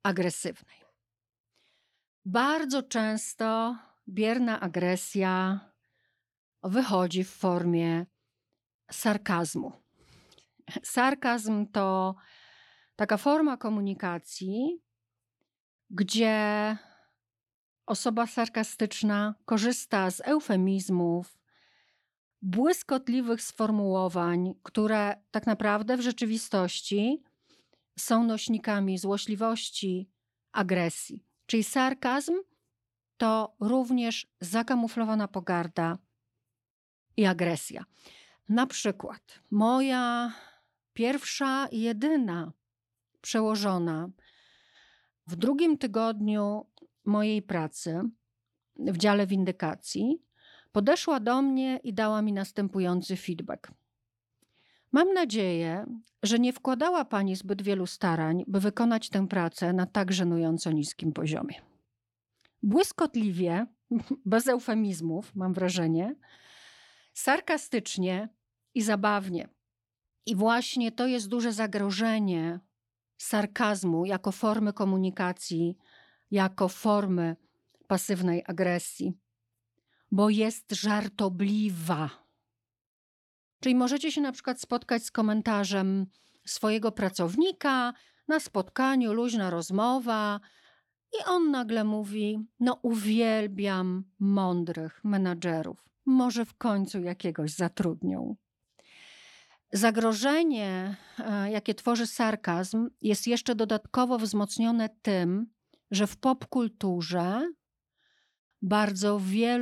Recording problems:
abrupt cut into speech; at the end

